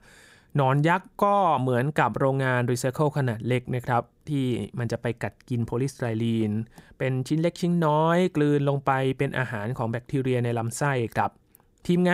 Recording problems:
abrupt cut into speech; at the end

